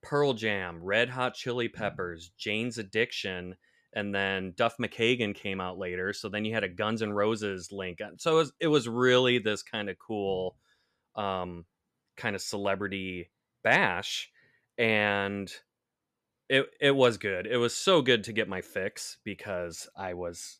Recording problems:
none

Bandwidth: 14.5 kHz